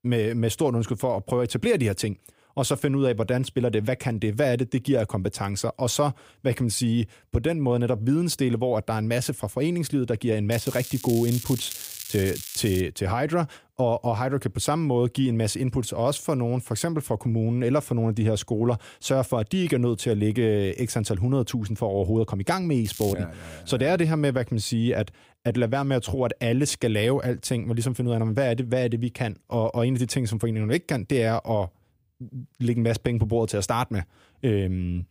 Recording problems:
crackling; noticeable; from 11 to 13 s and at 23 s; 10 dB below the speech

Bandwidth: 15.5 kHz